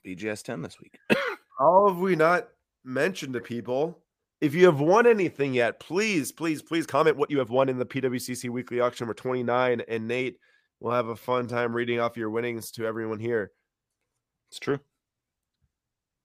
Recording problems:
uneven, jittery; strongly; from 1 to 12 s

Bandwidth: 15 kHz